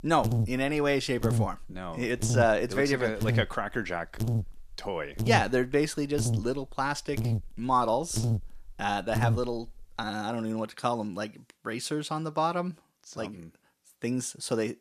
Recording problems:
electrical hum; noticeable; until 10 s; 50 Hz, 10 dB below the speech

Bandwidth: 14.5 kHz